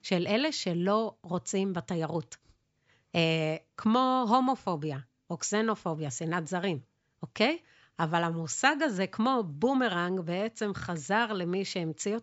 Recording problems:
high frequencies cut off; noticeable; nothing above 8 kHz

